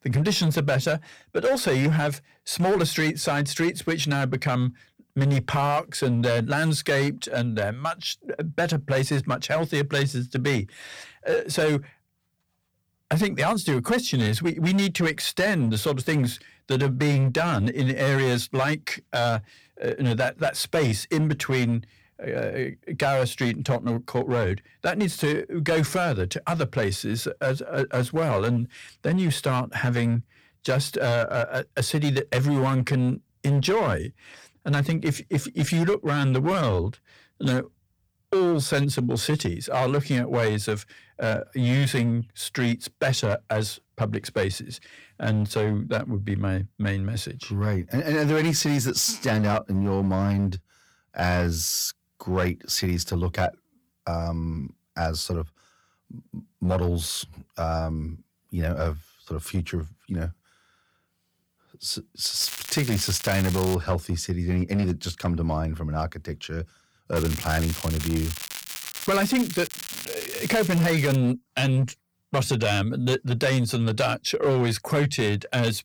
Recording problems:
distortion; slight; 8% of the sound clipped
crackling; loud; from 1:02 to 1:04 and from 1:07 to 1:11; 9 dB below the speech

